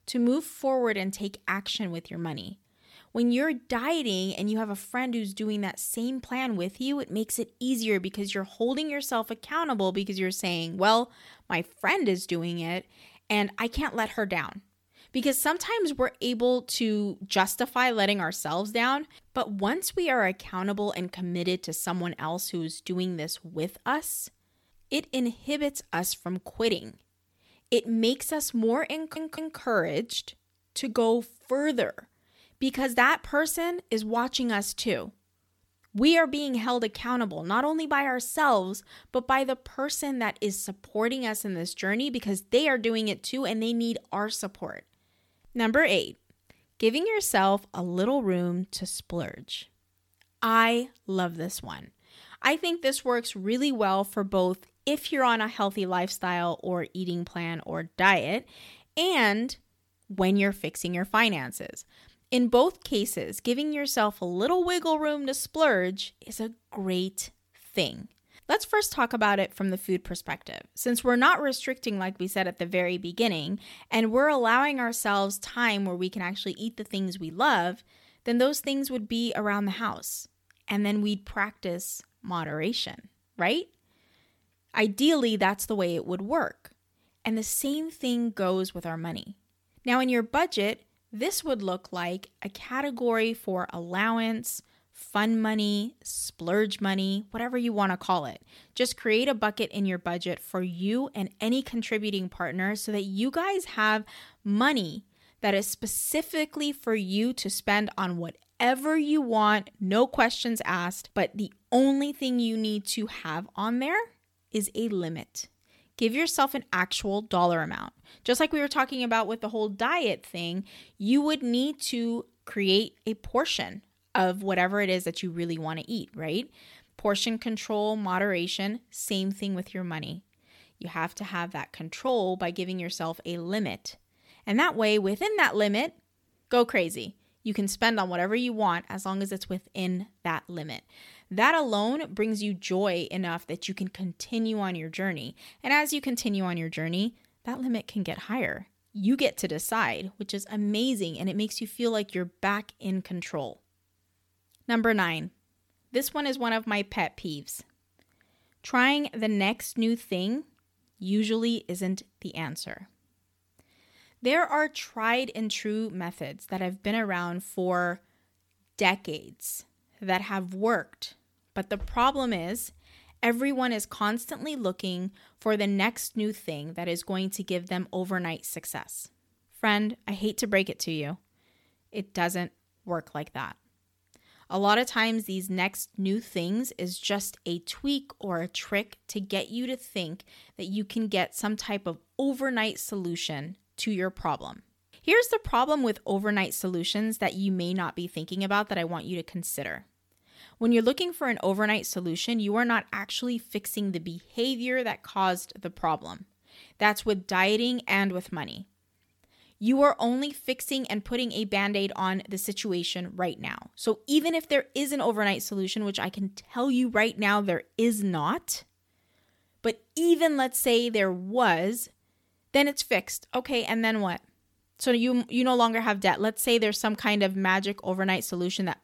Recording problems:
audio stuttering; at 29 s

